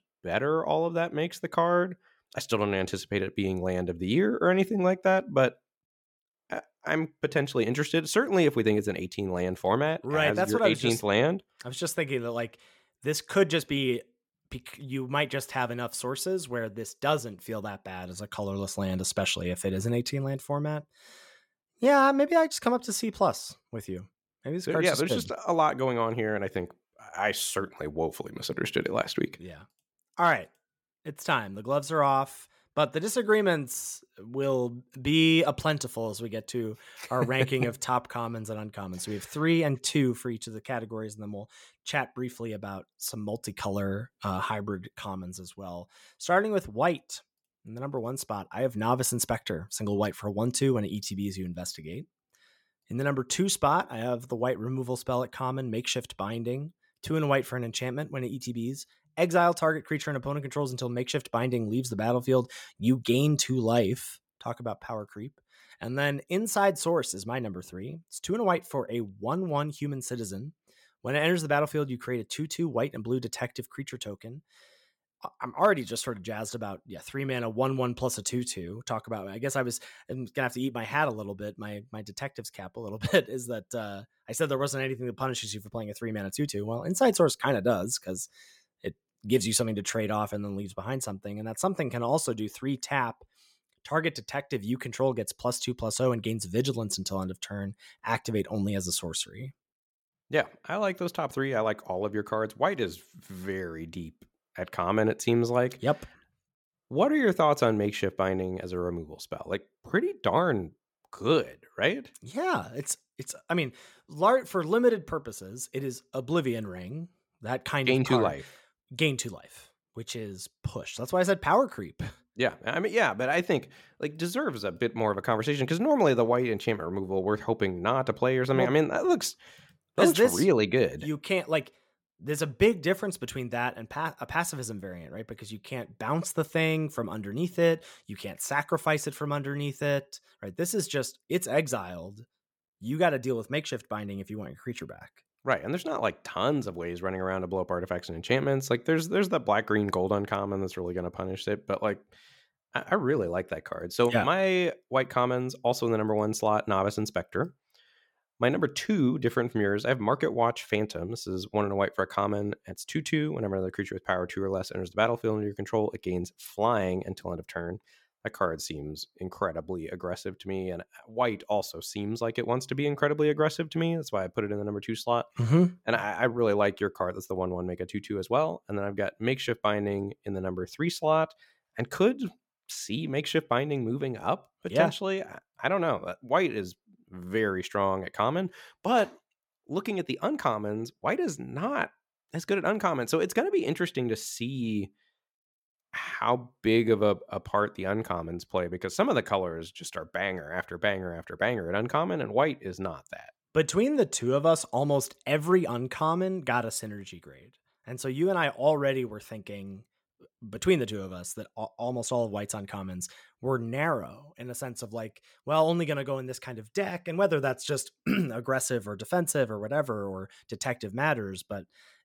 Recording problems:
none

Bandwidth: 17 kHz